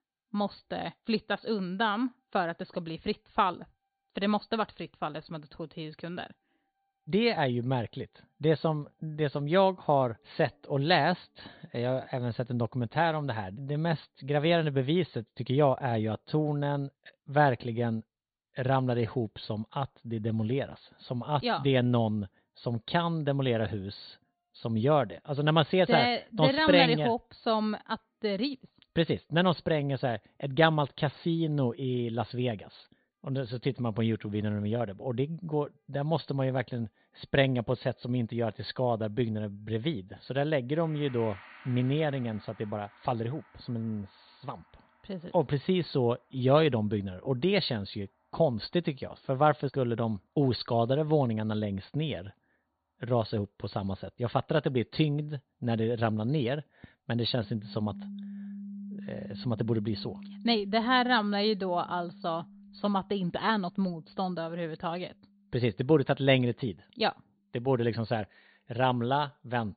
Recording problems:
high frequencies cut off; severe; nothing above 4.5 kHz
background music; noticeable; throughout; 20 dB below the speech

